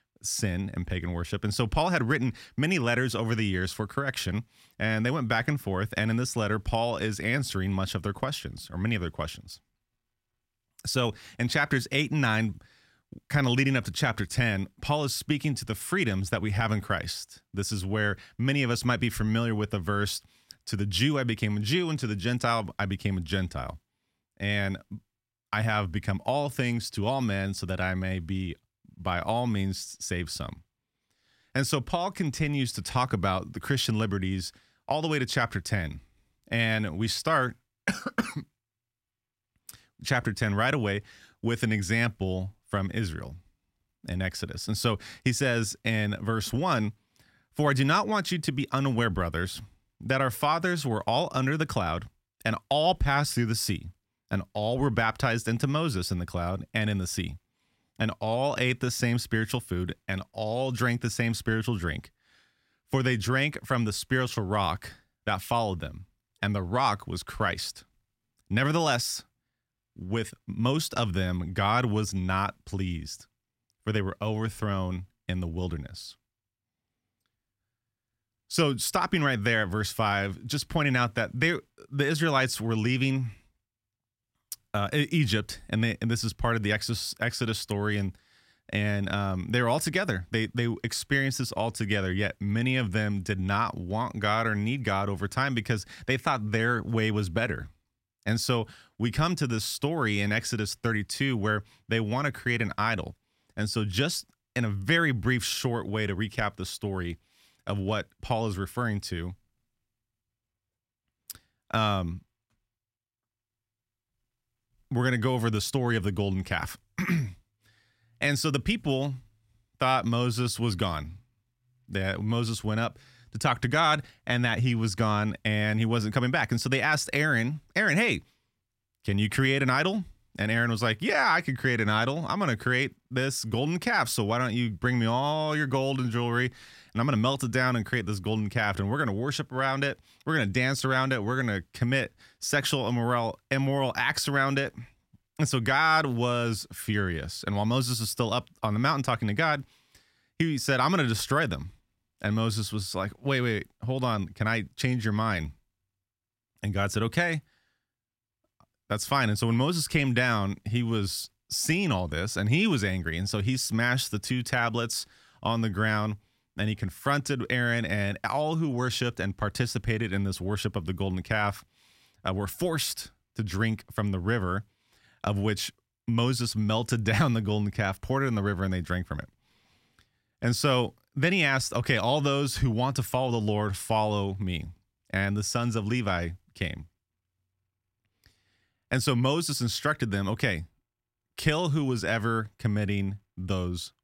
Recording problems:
none

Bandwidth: 16 kHz